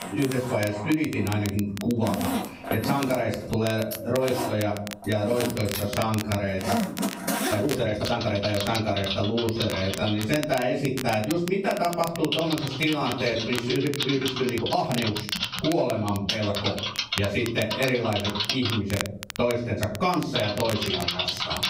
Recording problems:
off-mic speech; far
room echo; noticeable; dies away in 0.4 s
squashed, flat; somewhat
household noises; loud; throughout; 4 dB below the speech
crackle, like an old record; noticeable; 10 dB below the speech
uneven, jittery; strongly; from 5.5 to 15 s

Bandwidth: 15.5 kHz